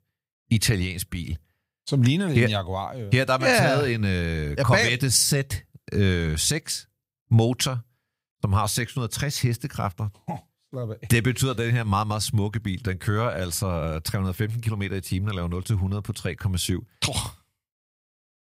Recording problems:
none

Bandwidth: 15.5 kHz